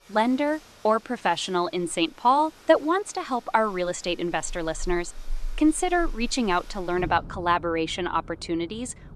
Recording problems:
rain or running water; noticeable; throughout; 20 dB below the speech

